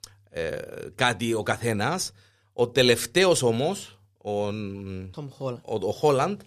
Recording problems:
none

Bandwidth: 15 kHz